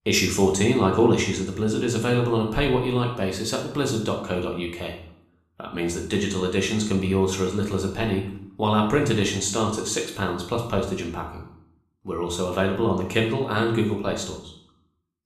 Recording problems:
room echo; noticeable; dies away in 0.6 s
off-mic speech; somewhat distant

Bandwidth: 14 kHz